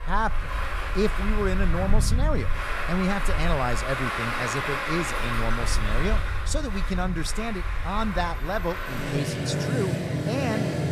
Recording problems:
traffic noise; very loud; throughout; 1 dB above the speech

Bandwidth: 14.5 kHz